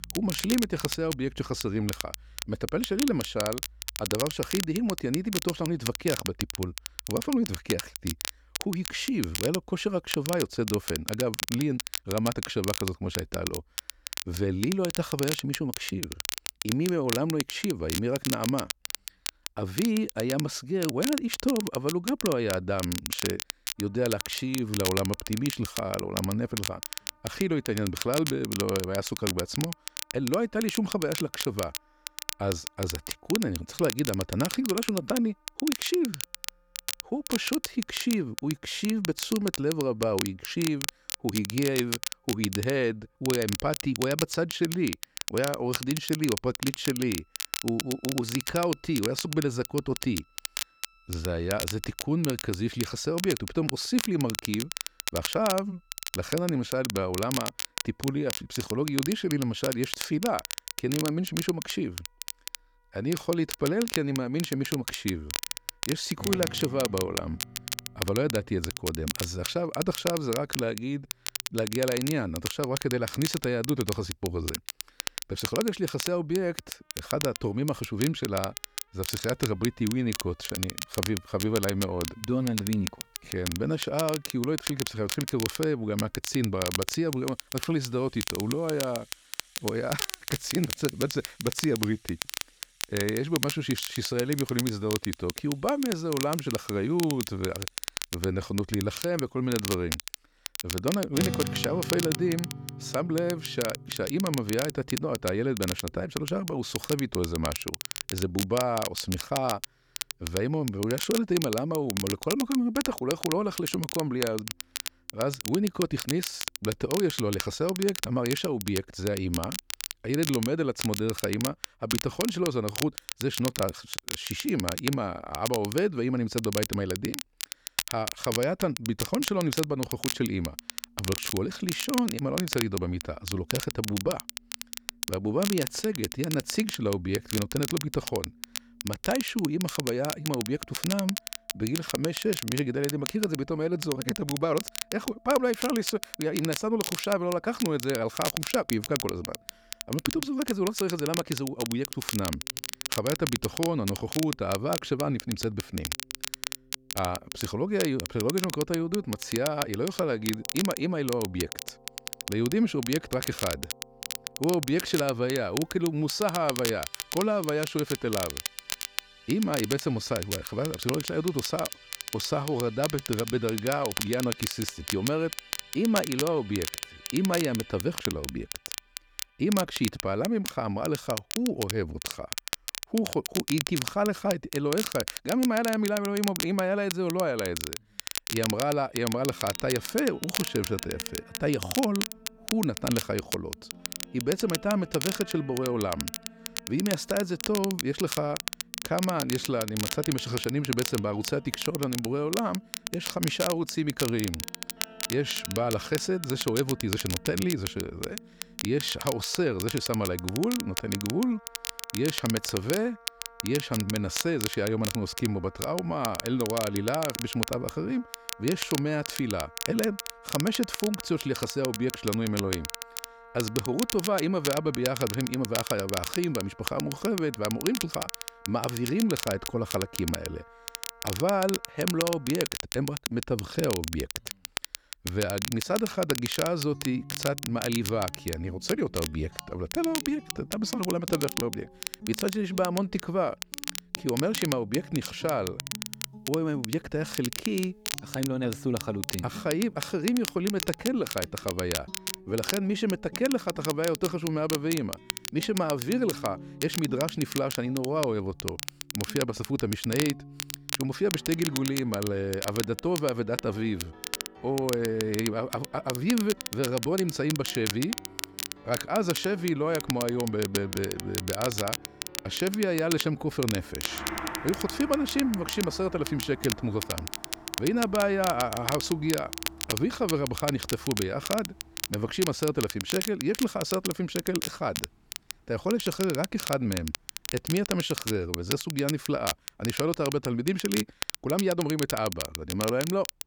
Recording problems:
crackle, like an old record; loud; 5 dB below the speech
background music; noticeable; throughout; 20 dB below the speech

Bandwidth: 19 kHz